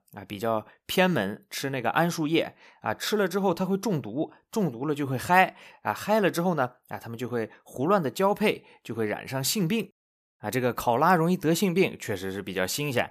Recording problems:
none

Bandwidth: 14.5 kHz